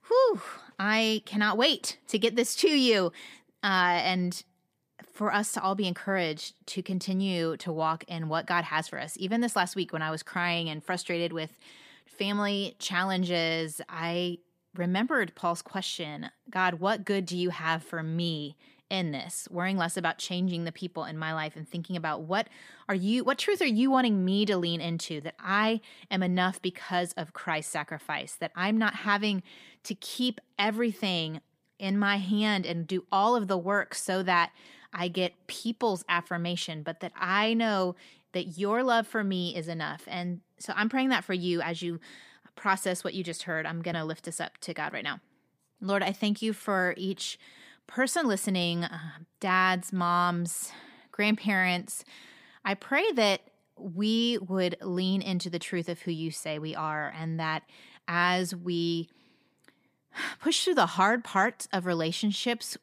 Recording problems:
none

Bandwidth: 15 kHz